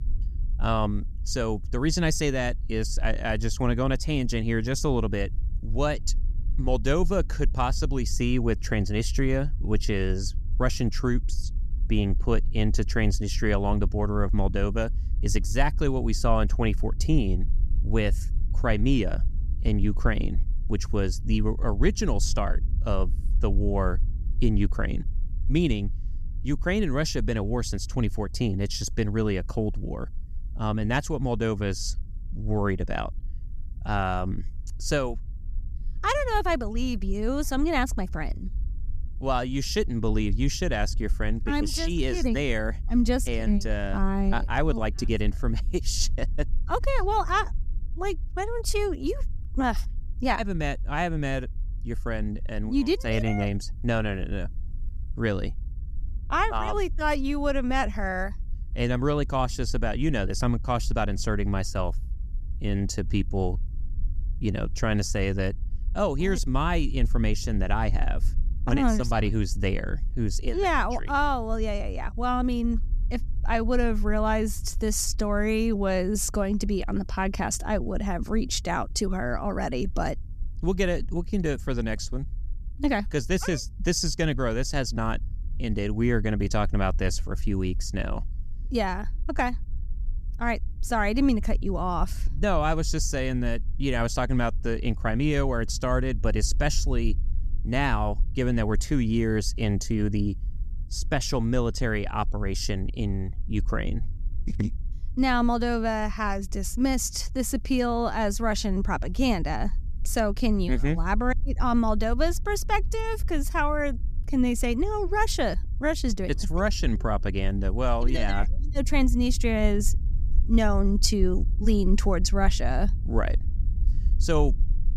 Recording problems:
low rumble; faint; throughout; 25 dB below the speech

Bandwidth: 14.5 kHz